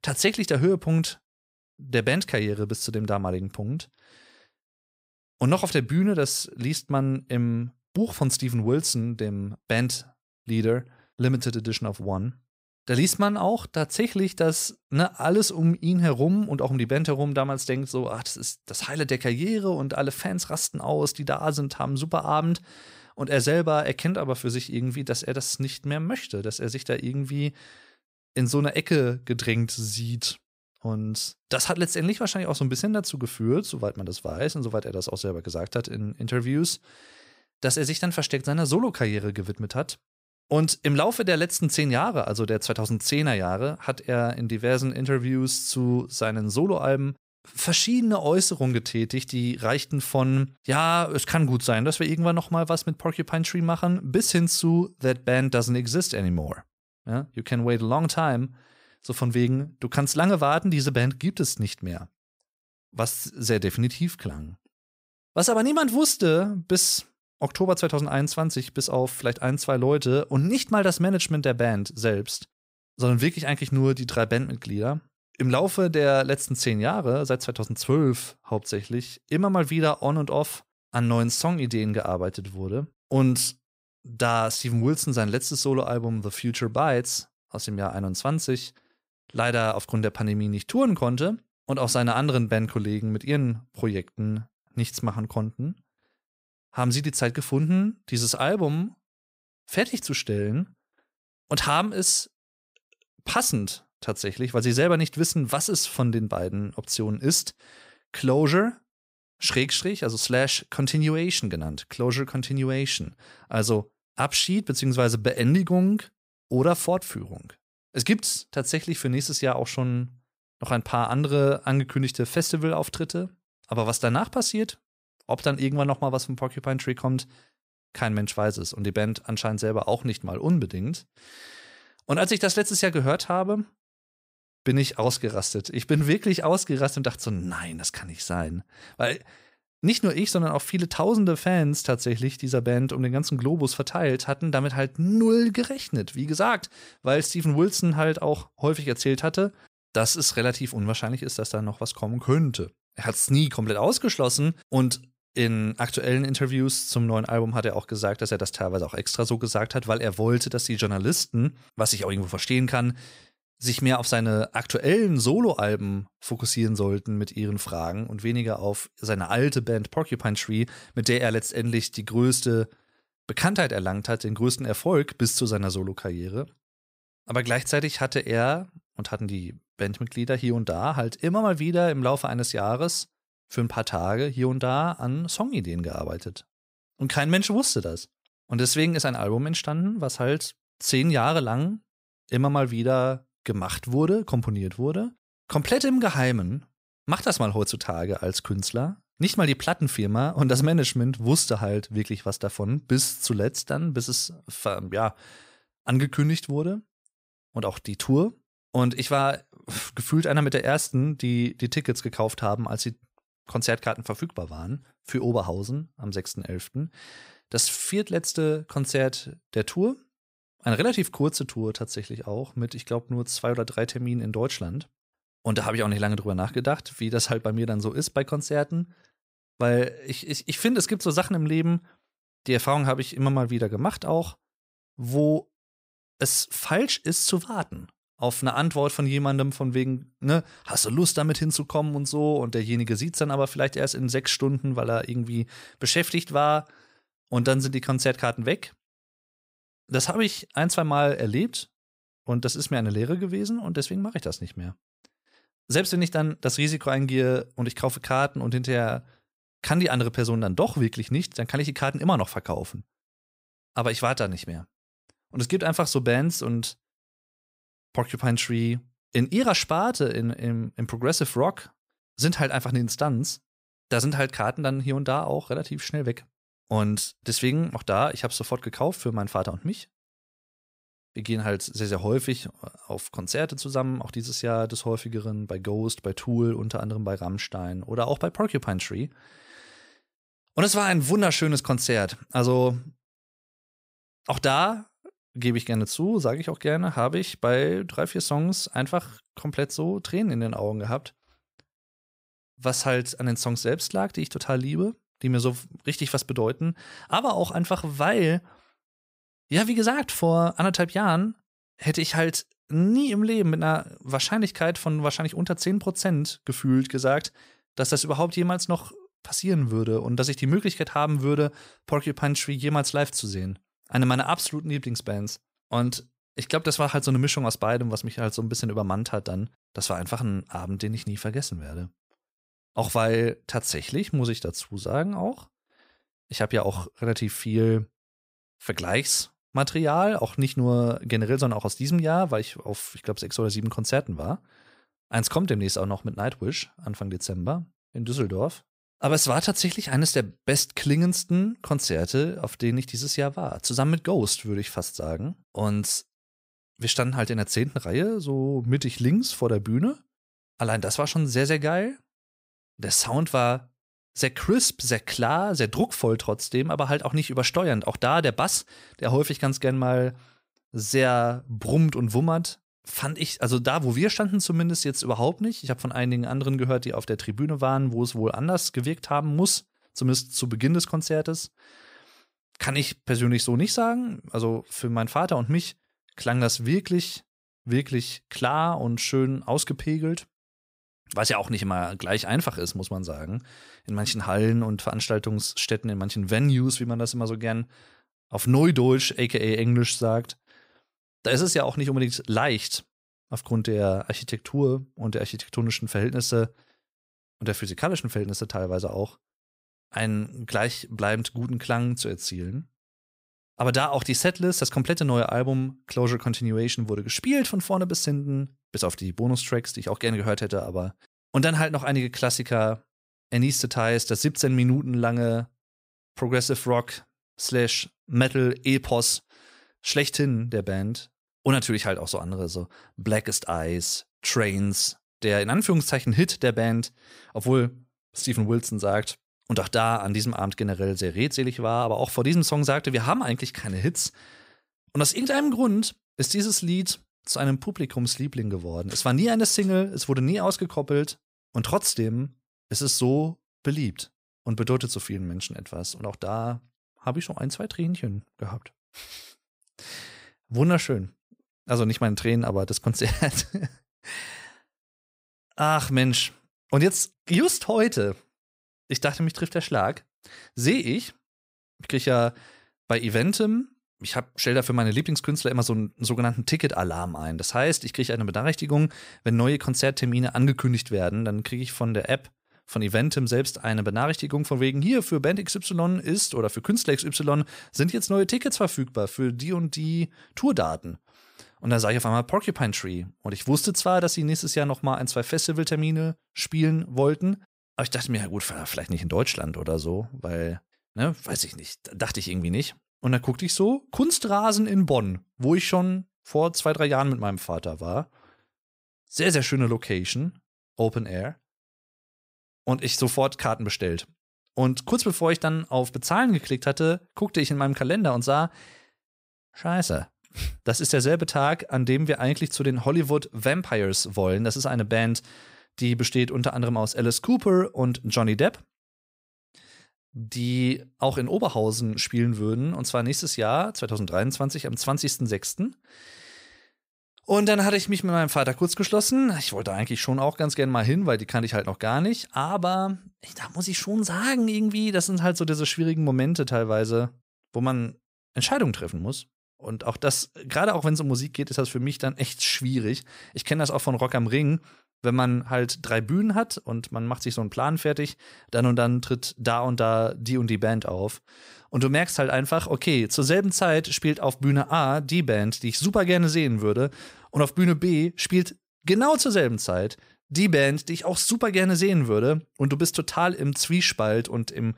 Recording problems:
none

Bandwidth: 15.5 kHz